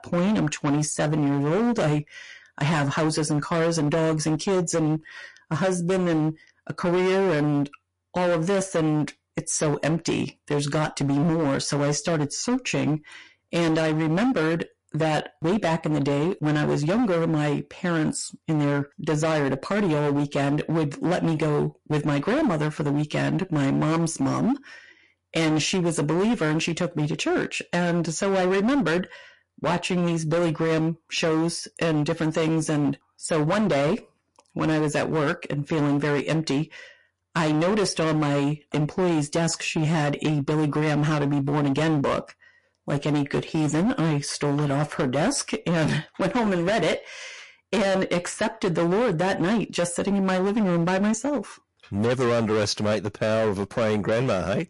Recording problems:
distortion; heavy; 21% of the sound clipped
garbled, watery; slightly; nothing above 10 kHz

